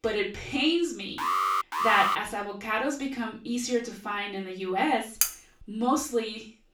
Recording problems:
off-mic speech; far
room echo; slight; dies away in 0.3 s
alarm; loud; at 1 s; peak 3 dB above the speech
clattering dishes; loud; at 5 s; peak 2 dB above the speech

